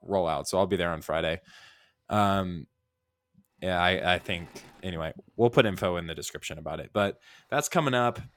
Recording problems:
machinery noise; faint; from 4 s on; 30 dB below the speech

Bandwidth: 17.5 kHz